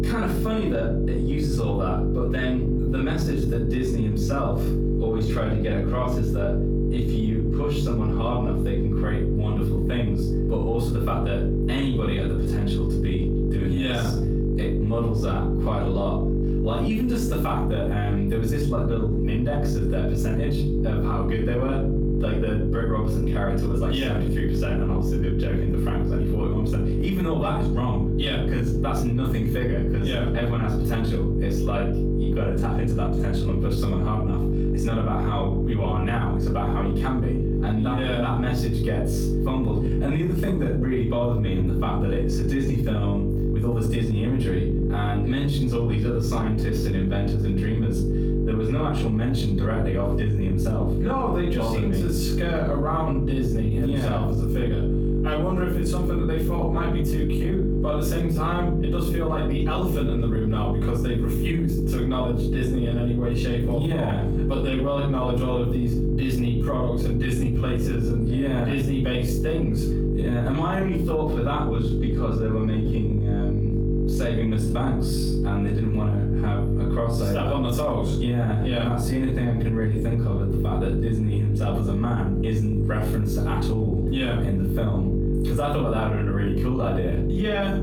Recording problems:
off-mic speech; far
room echo; noticeable; dies away in 0.7 s
squashed, flat; somewhat
electrical hum; loud; throughout; 50 Hz, 3 dB below the speech

